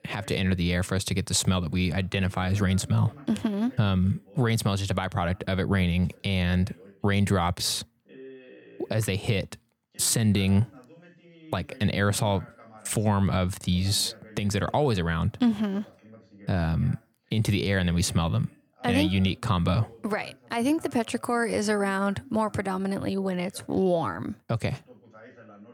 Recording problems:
voice in the background; faint; throughout; 25 dB below the speech

